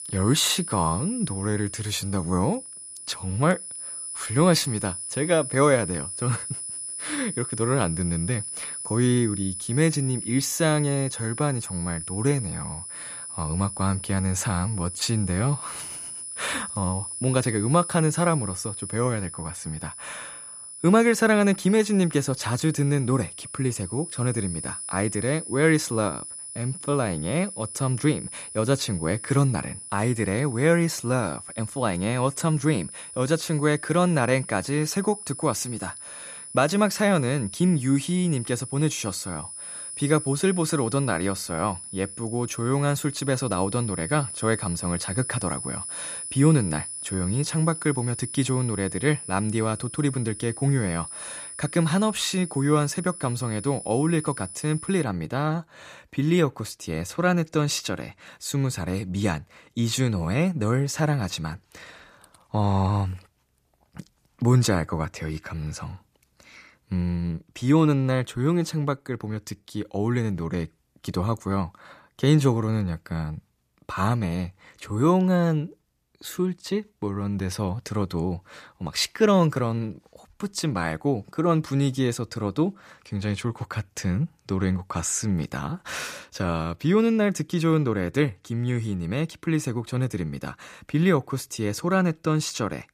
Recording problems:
high-pitched whine; loud; until 55 s; 10 kHz, 9 dB below the speech

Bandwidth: 14.5 kHz